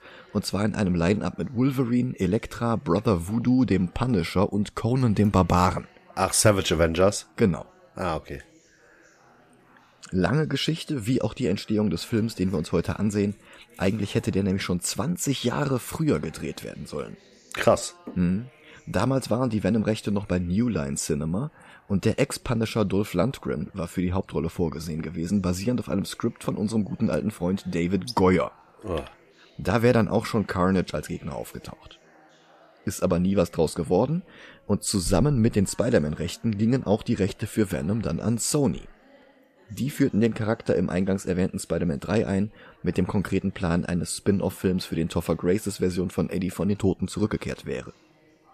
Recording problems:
background chatter; faint; throughout; 4 voices, 30 dB below the speech

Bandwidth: 14.5 kHz